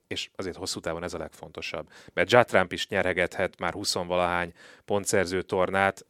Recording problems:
none

